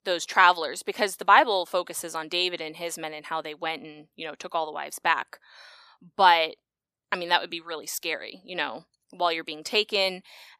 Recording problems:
thin; very slightly; fading below 1 kHz

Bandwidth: 14.5 kHz